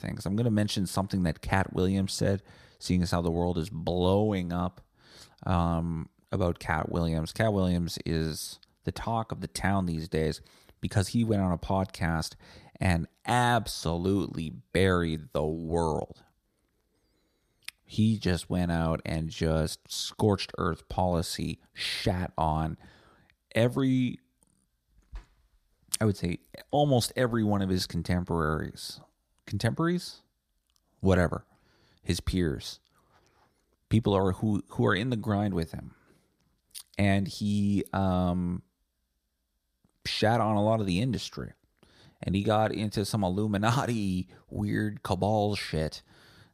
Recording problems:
none

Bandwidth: 14.5 kHz